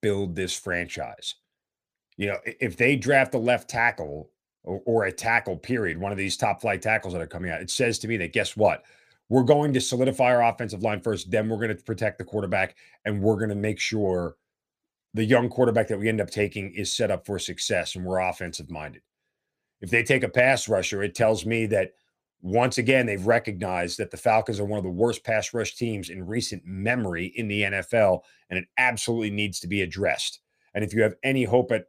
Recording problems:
none

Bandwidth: 15 kHz